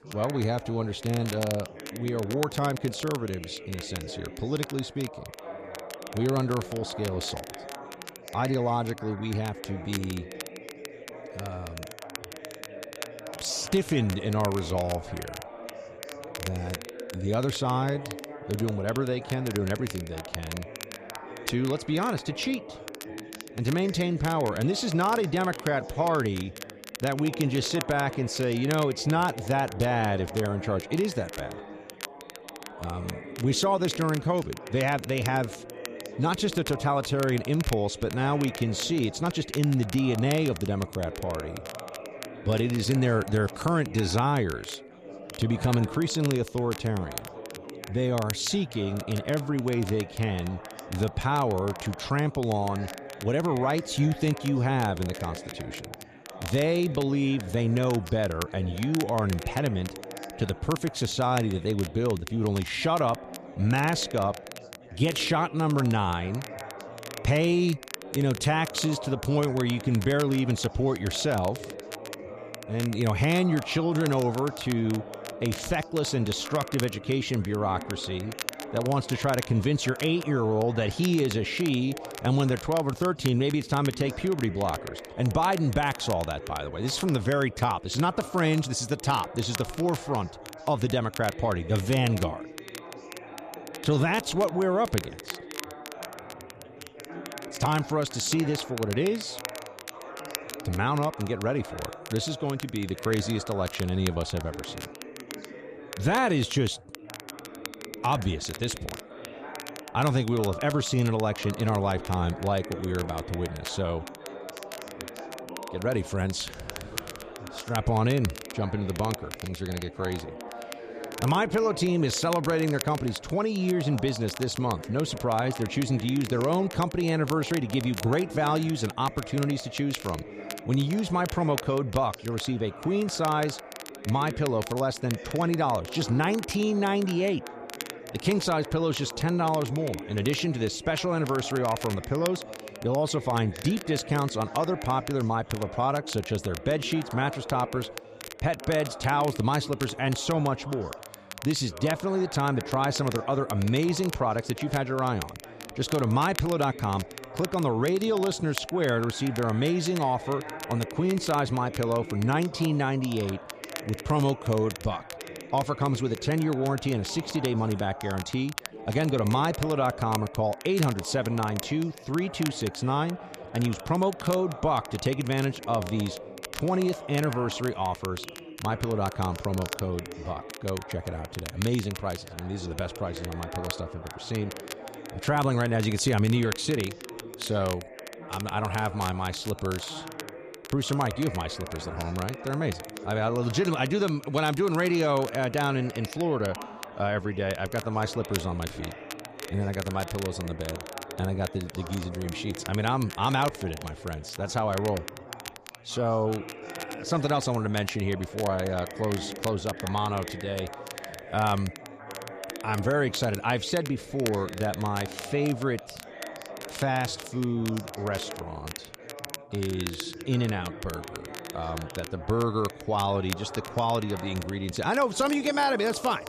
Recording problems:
background chatter; noticeable; throughout; 4 voices, 15 dB below the speech
crackle, like an old record; noticeable; 15 dB below the speech

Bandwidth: 14.5 kHz